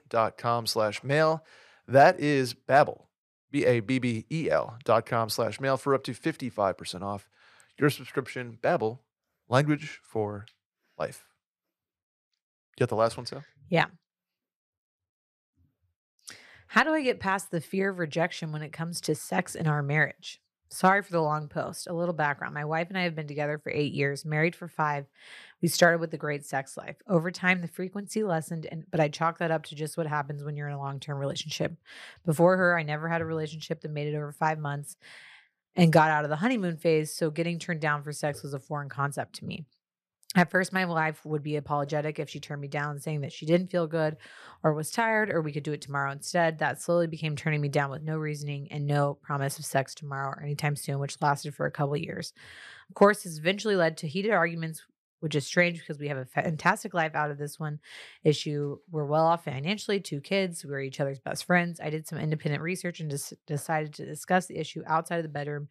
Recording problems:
none

